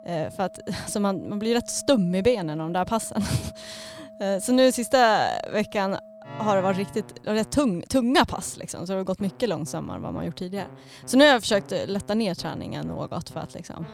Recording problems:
background music; noticeable; throughout; 20 dB below the speech

